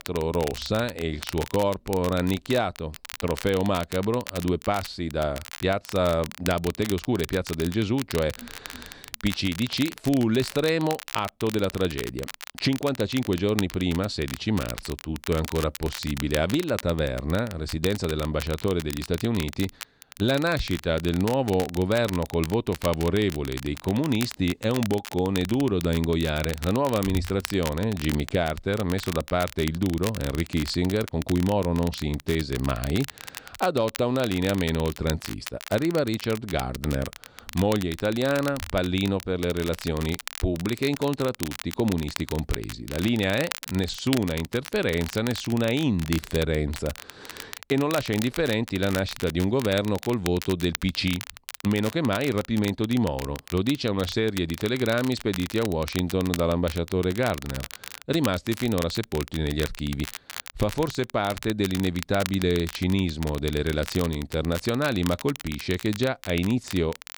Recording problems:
crackle, like an old record; noticeable; 10 dB below the speech

